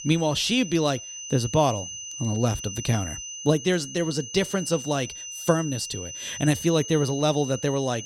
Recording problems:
high-pitched whine; loud; throughout; 6 kHz, 9 dB below the speech

